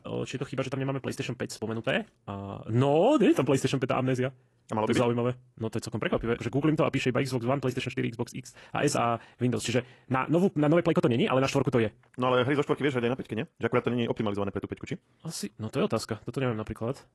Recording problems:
wrong speed, natural pitch; too fast; 1.7 times normal speed
garbled, watery; slightly; nothing above 11.5 kHz

